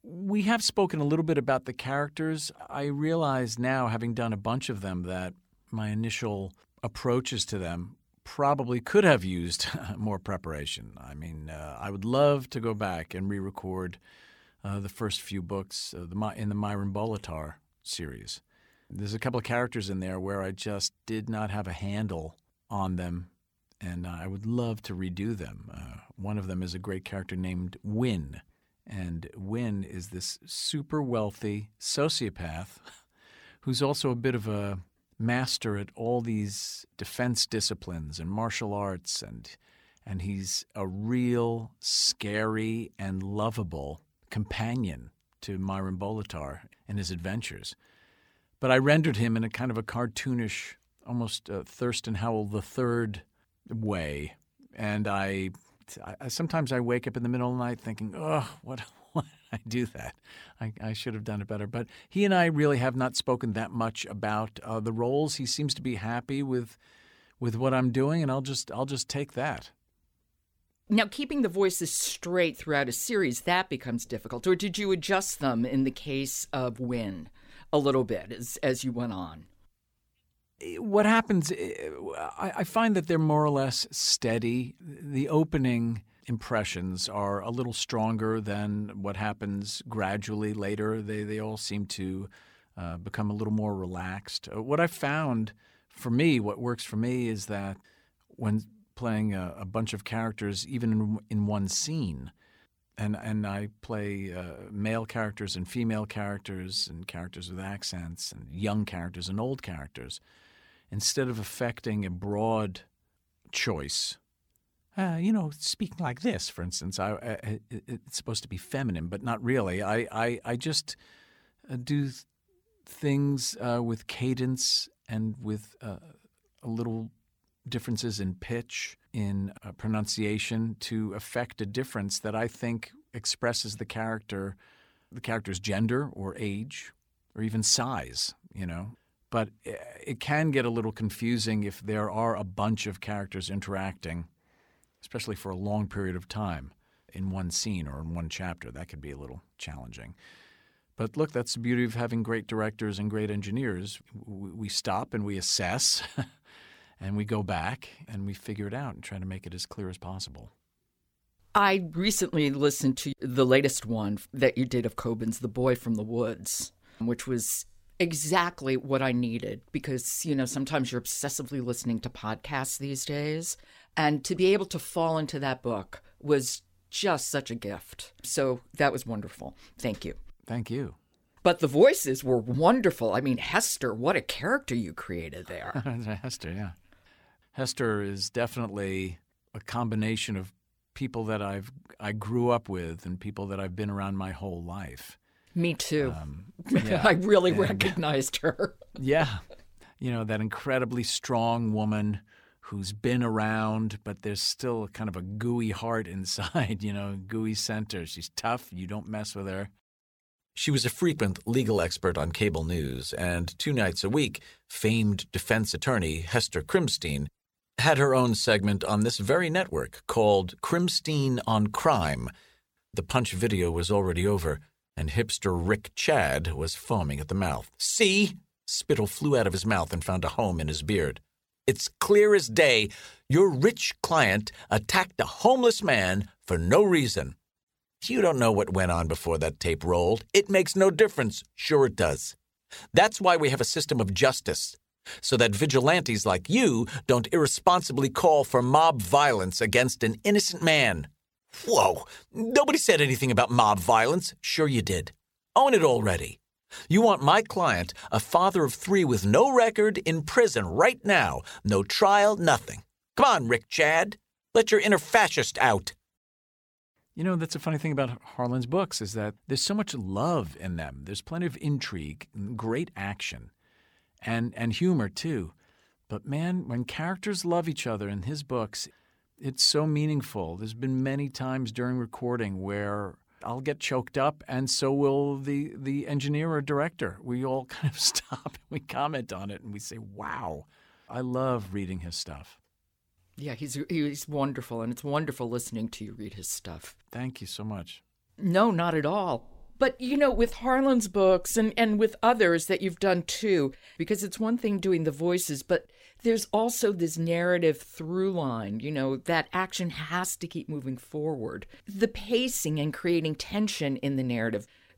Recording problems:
uneven, jittery; slightly; from 55 s to 4:16

